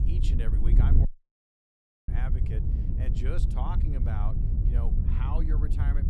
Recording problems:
wind noise on the microphone; heavy; 1 dB below the speech
audio cutting out; at 1 s for 1 s

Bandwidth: 14.5 kHz